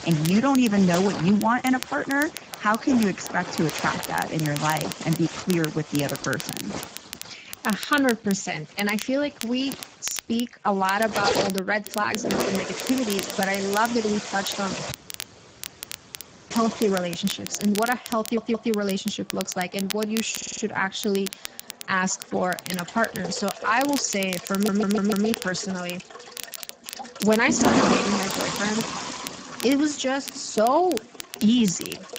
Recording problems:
garbled, watery; badly; nothing above 7.5 kHz
household noises; loud; throughout; 6 dB below the speech
crackle, like an old record; noticeable; 10 dB below the speech
audio cutting out; at 15 s for 1.5 s
audio stuttering; at 18 s, at 20 s and at 25 s

